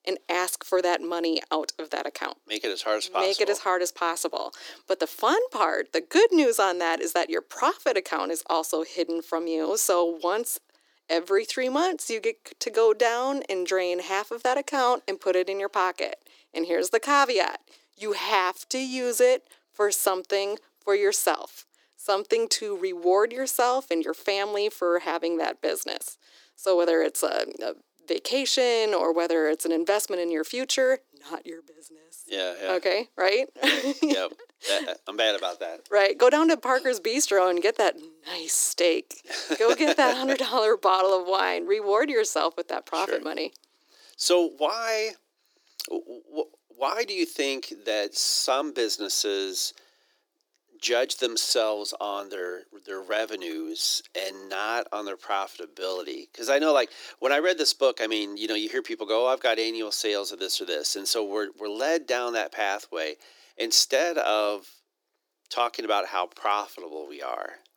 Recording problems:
thin; very; fading below 300 Hz

